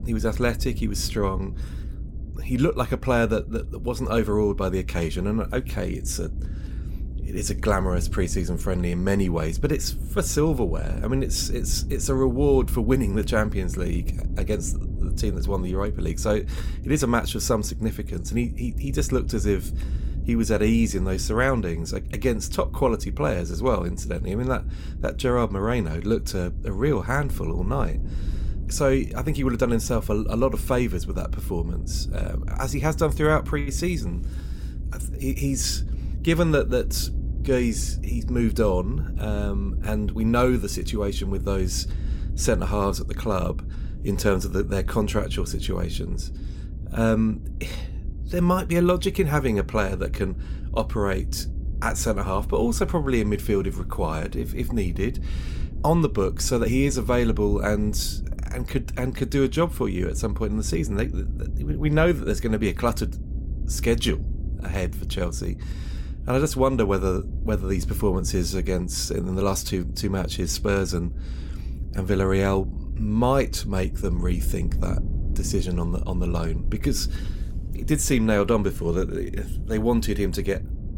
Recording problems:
low rumble; noticeable; throughout; 20 dB below the speech

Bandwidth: 16.5 kHz